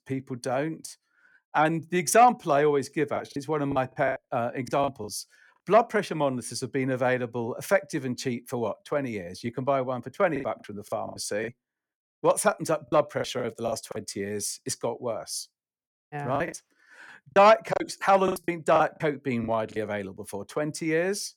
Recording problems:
choppy; very; from 3 to 5 s, from 10 to 14 s and from 16 to 20 s; 14% of the speech affected

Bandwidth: 18 kHz